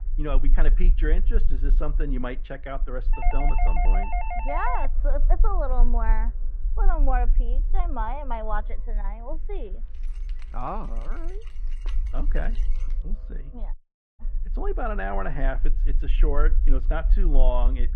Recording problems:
muffled; very; fading above 2 kHz
background music; faint; throughout; 30 dB below the speech
low rumble; faint; throughout; 20 dB below the speech
doorbell; loud; from 3 to 5 s; peak 1 dB above the speech
jangling keys; faint; from 10 to 13 s; peak 15 dB below the speech
audio cutting out; at 14 s

